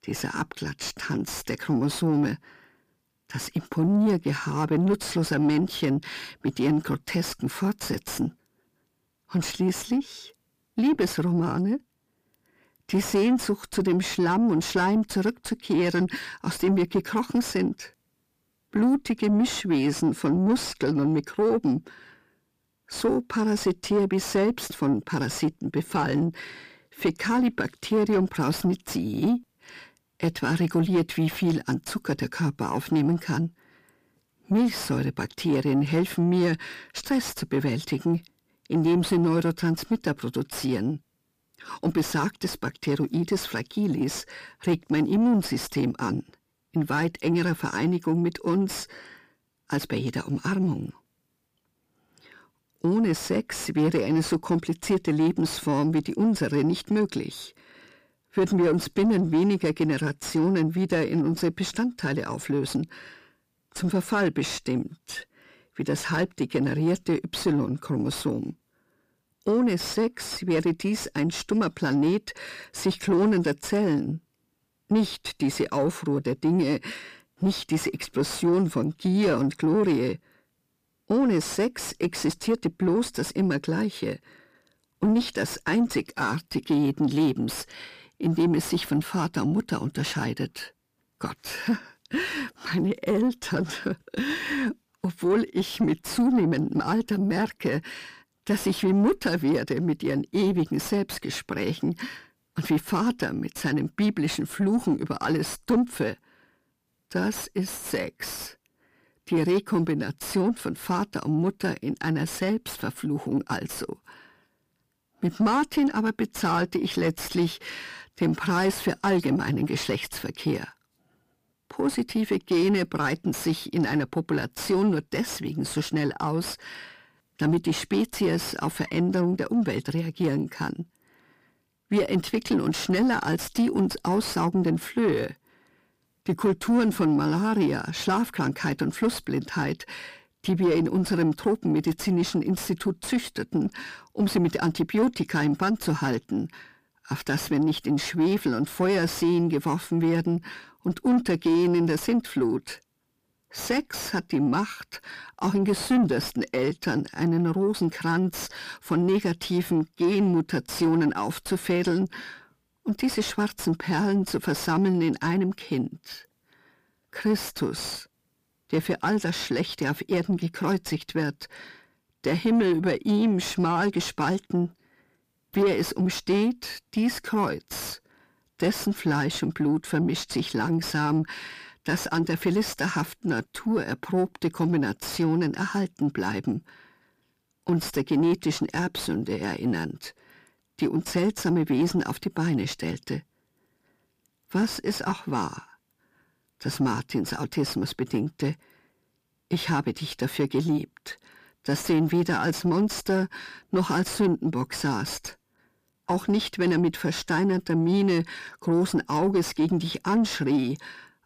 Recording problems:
distortion; slight; 10 dB below the speech

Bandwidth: 15 kHz